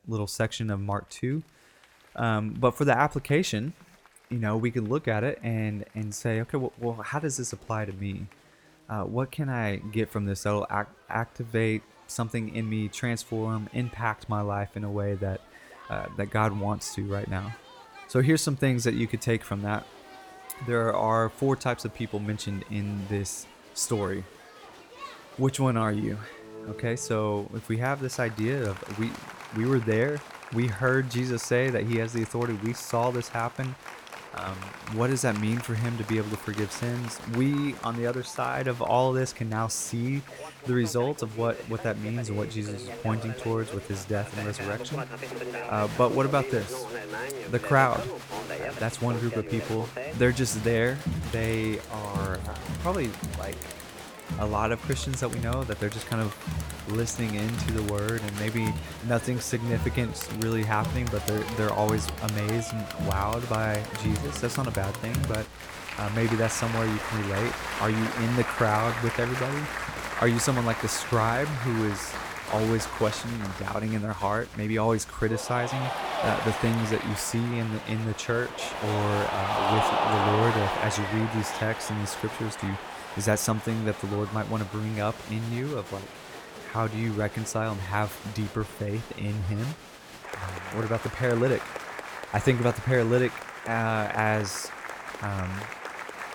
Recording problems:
crowd noise; loud; throughout; 7 dB below the speech

